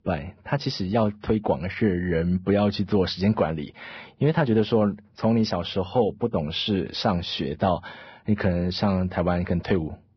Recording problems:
garbled, watery; badly; nothing above 5.5 kHz

